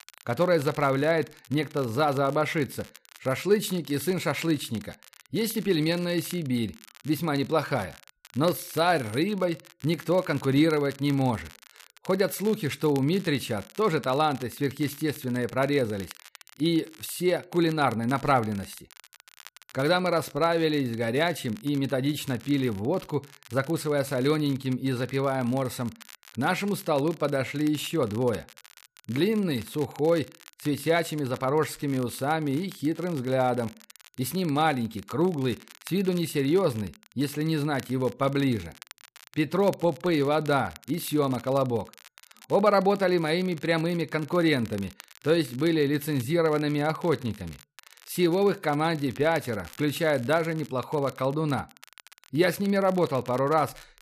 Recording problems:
crackle, like an old record; faint; 20 dB below the speech

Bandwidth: 14.5 kHz